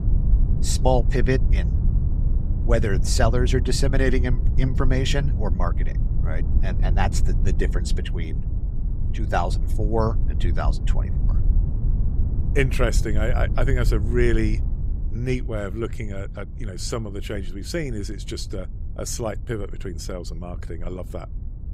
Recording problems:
low rumble; noticeable; throughout; 15 dB below the speech

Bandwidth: 15.5 kHz